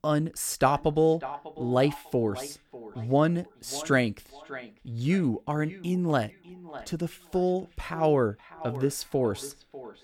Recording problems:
echo of what is said; noticeable; throughout; 600 ms later, 15 dB below the speech

